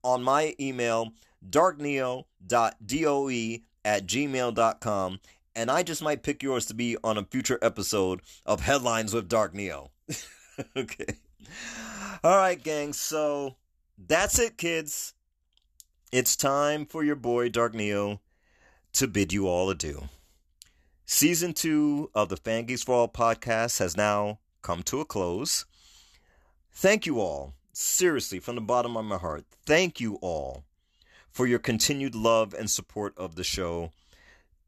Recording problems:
none

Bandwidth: 13.5 kHz